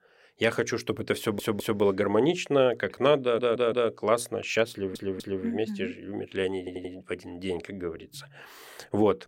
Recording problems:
audio stuttering; 4 times, first at 1 s

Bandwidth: 16 kHz